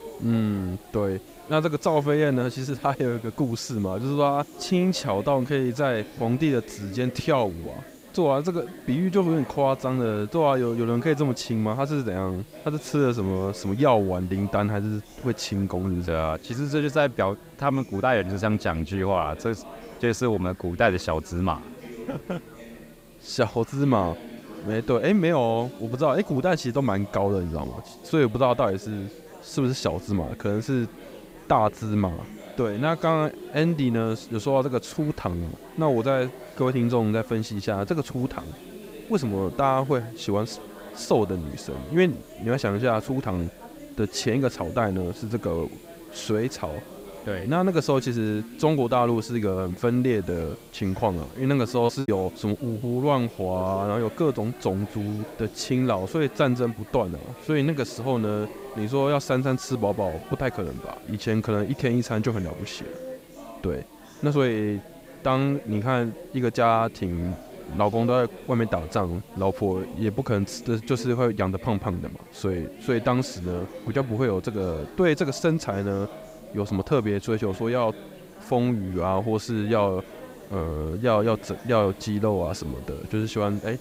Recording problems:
chatter from many people; noticeable; throughout; 15 dB below the speech
hiss; faint; throughout; 30 dB below the speech
choppy; very; at 52 s; 8% of the speech affected

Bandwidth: 15.5 kHz